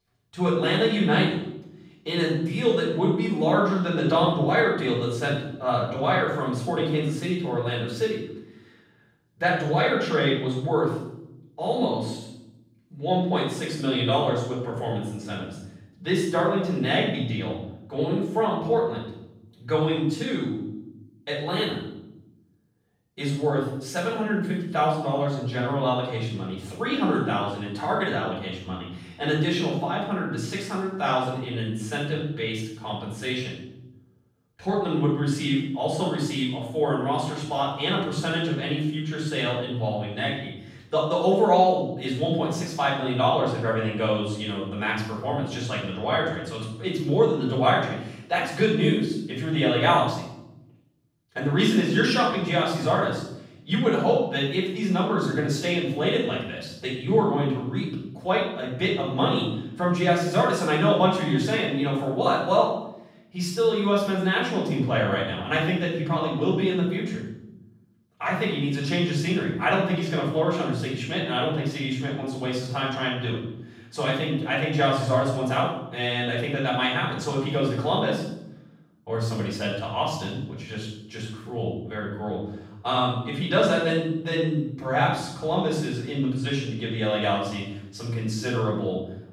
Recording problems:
off-mic speech; far
room echo; noticeable; dies away in 0.8 s

